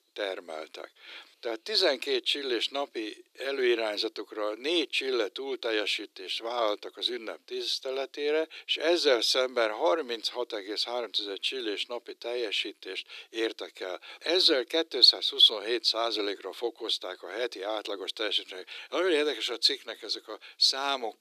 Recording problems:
thin; very; fading below 350 Hz

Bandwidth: 14.5 kHz